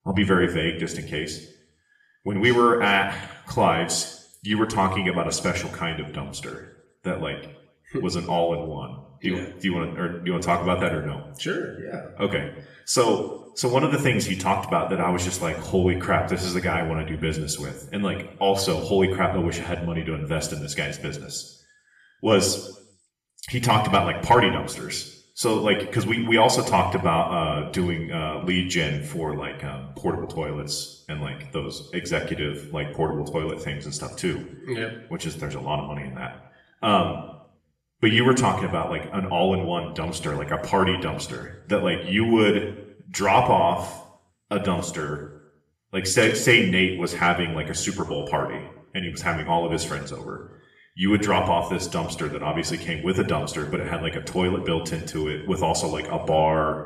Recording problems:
room echo; slight; dies away in 0.7 s
off-mic speech; somewhat distant

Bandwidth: 14 kHz